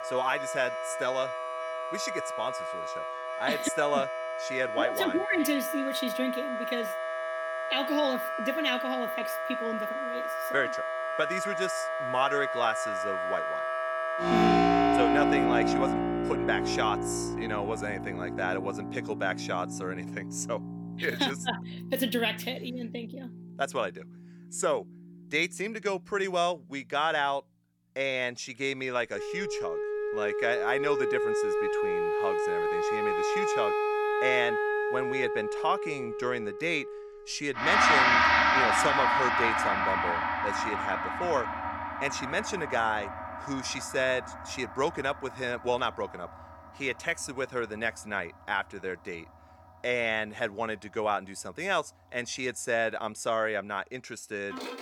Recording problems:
background music; very loud; throughout; 2 dB above the speech

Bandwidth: 18 kHz